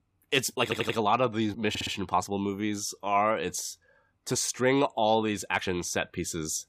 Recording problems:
uneven, jittery; strongly; from 0.5 to 5.5 s
audio stuttering; at 0.5 s and at 1.5 s

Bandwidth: 15 kHz